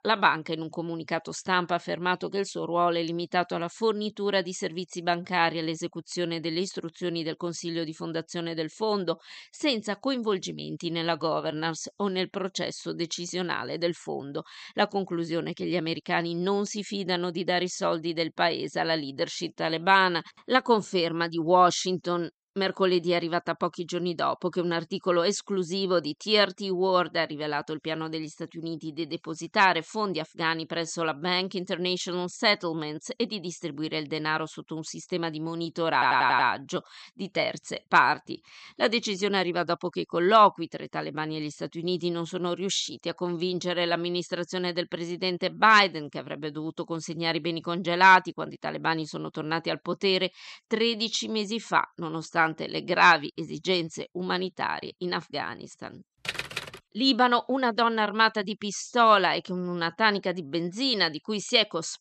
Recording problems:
audio stuttering; at 36 s

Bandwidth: 13 kHz